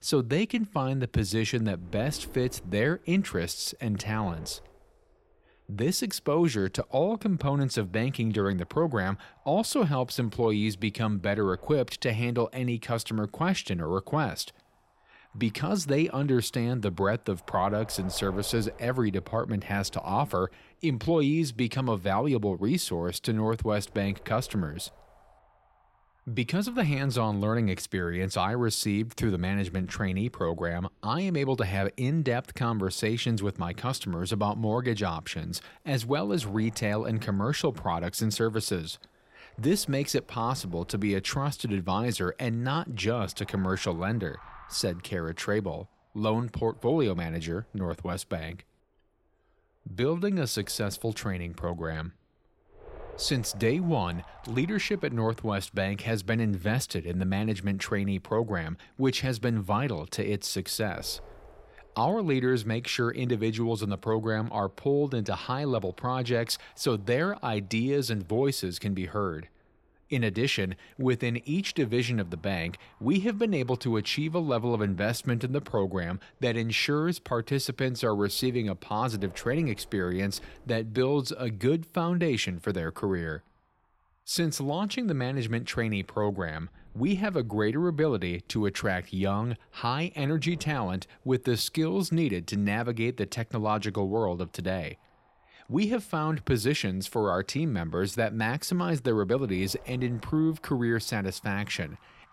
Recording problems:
wind noise on the microphone; occasional gusts; 25 dB below the speech

